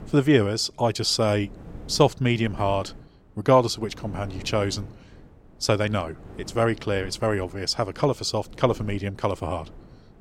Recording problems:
wind noise on the microphone; occasional gusts; 25 dB below the speech

